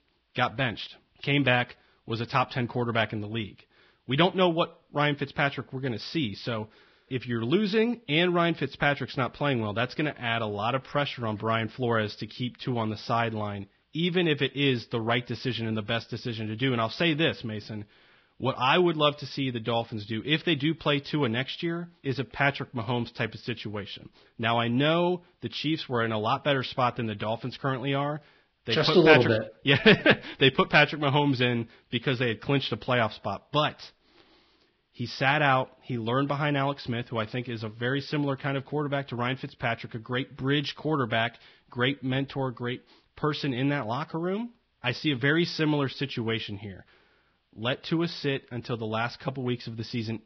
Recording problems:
garbled, watery; badly; nothing above 5.5 kHz

